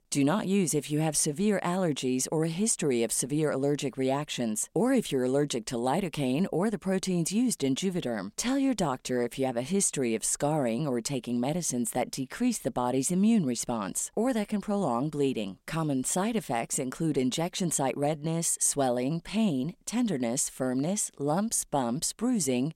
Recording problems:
none

